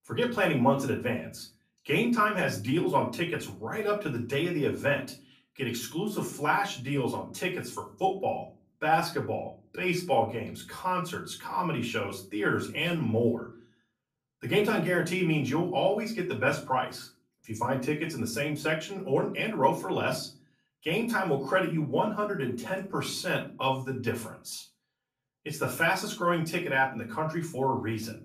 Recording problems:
off-mic speech; far
room echo; very slight; dies away in 0.3 s

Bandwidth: 14.5 kHz